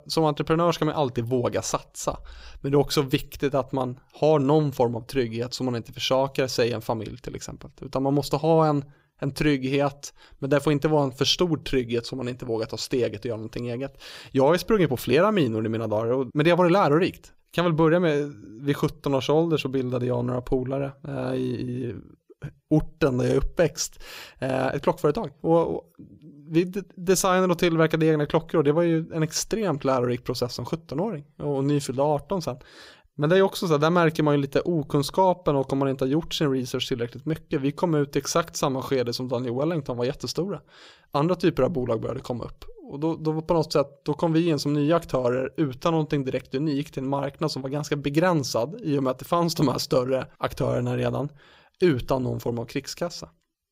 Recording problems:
none

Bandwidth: 15.5 kHz